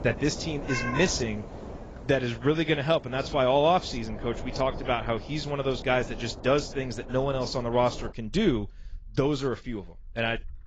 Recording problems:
garbled, watery; badly; nothing above 7.5 kHz
animal sounds; noticeable; throughout; 15 dB below the speech
wind noise on the microphone; occasional gusts; until 8 s; 15 dB below the speech

